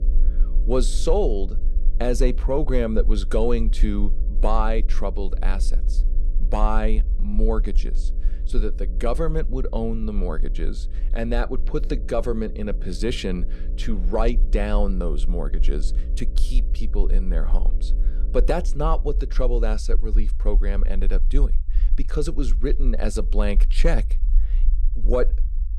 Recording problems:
electrical hum; faint; until 20 s; 60 Hz, 20 dB below the speech
low rumble; faint; throughout; 25 dB below the speech

